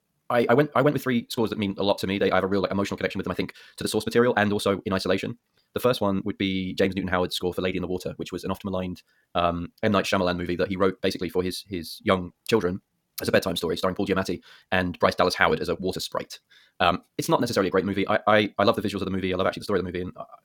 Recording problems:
wrong speed, natural pitch; too fast; 1.7 times normal speed

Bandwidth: 17.5 kHz